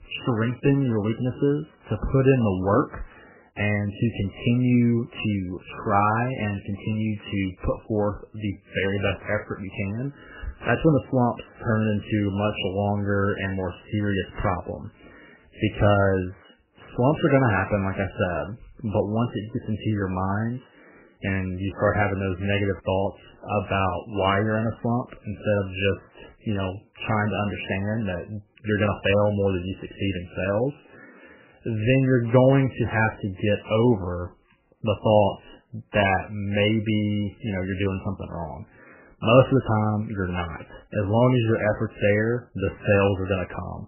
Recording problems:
garbled, watery; badly; nothing above 3 kHz

